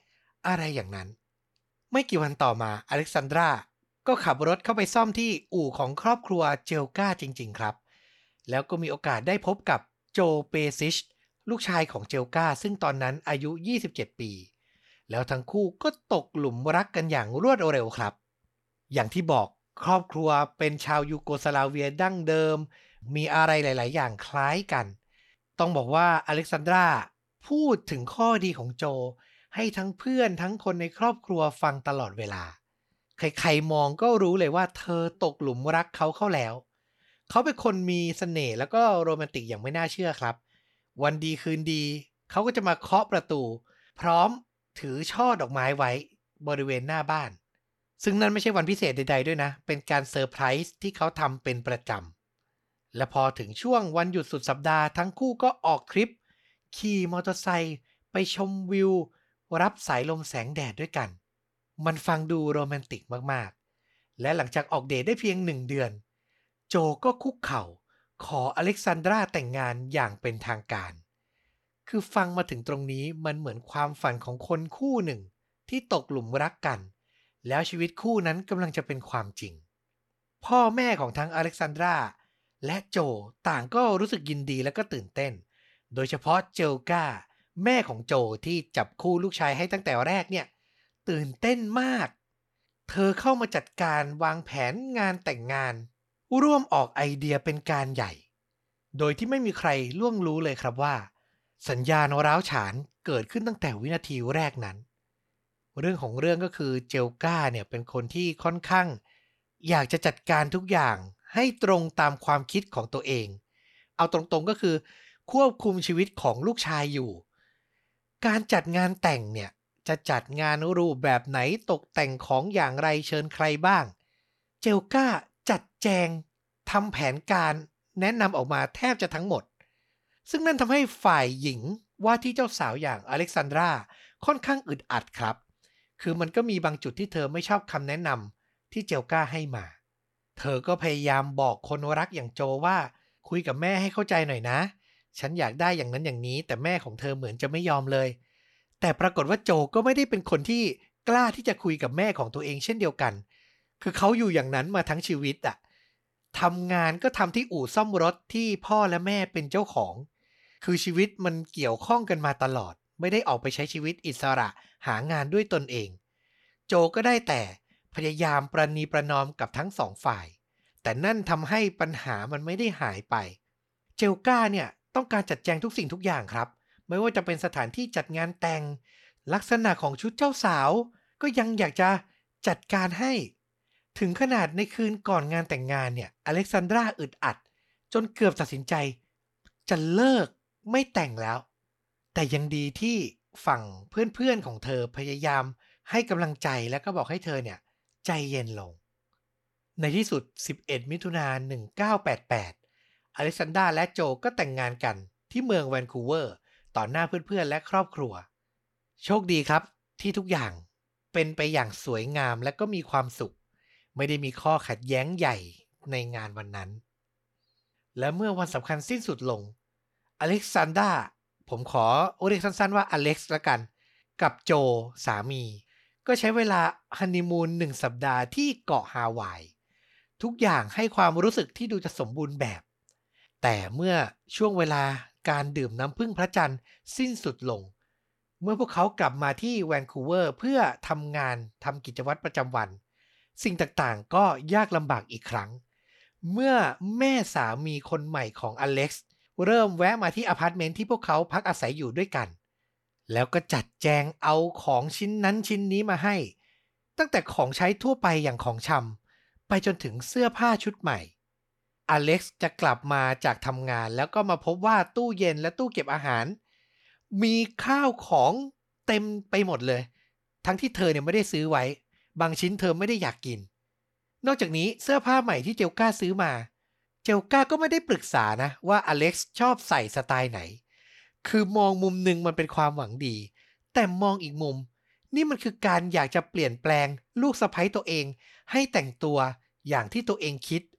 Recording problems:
none

